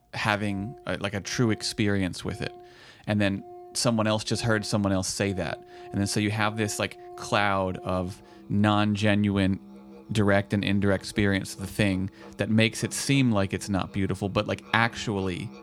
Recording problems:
background music; faint; throughout; 20 dB below the speech

